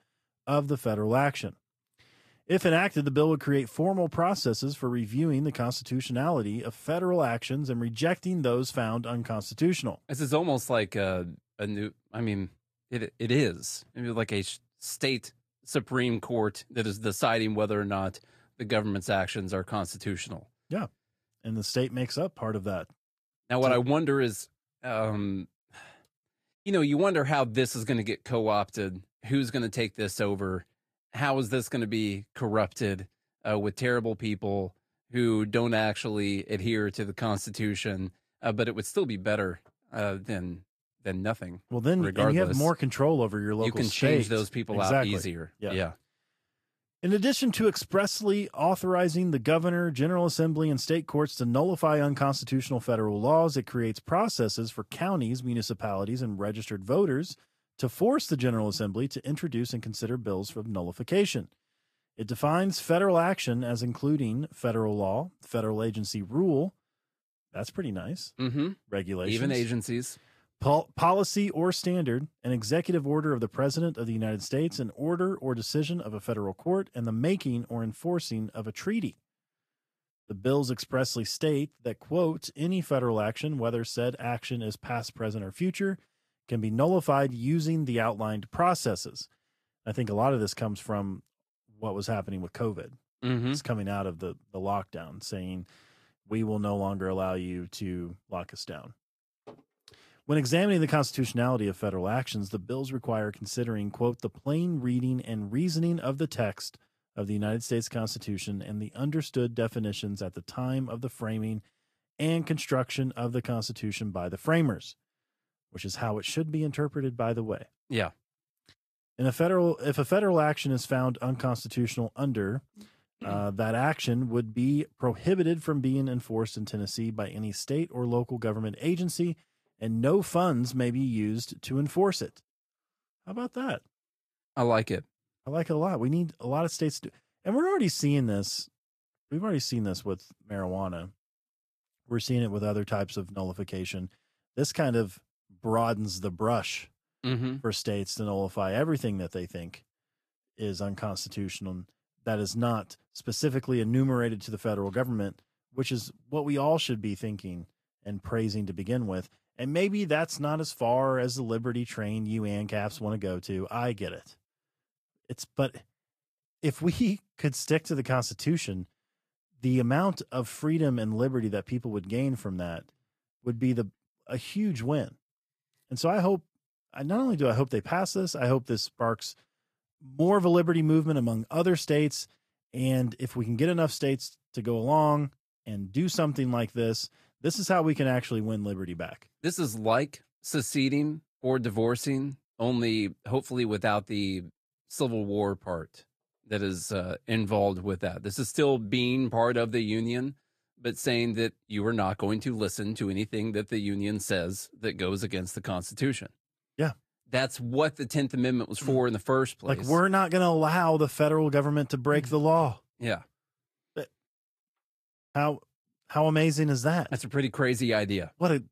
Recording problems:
garbled, watery; slightly; nothing above 14.5 kHz

